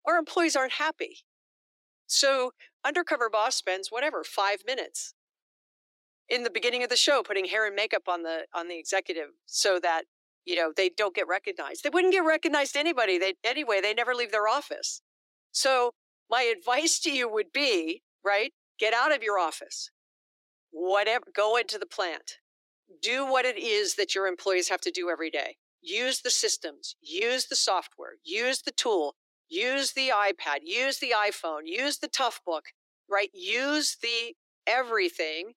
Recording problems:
thin; very; fading below 350 Hz

